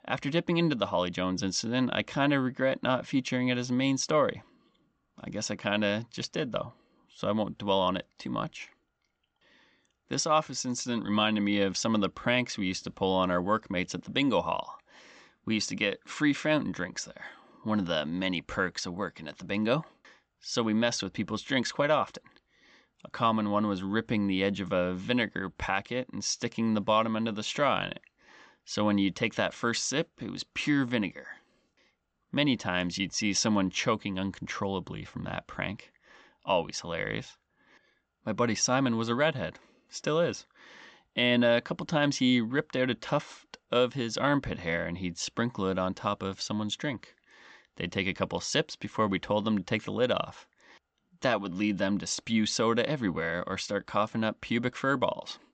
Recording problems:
high frequencies cut off; noticeable; nothing above 8 kHz

